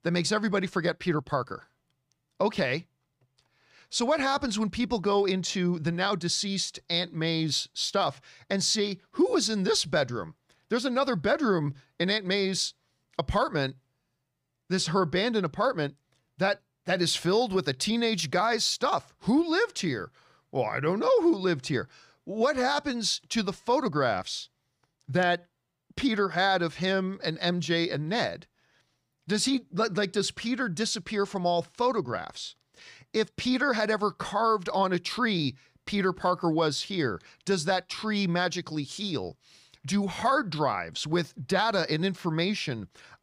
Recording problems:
none

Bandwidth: 15 kHz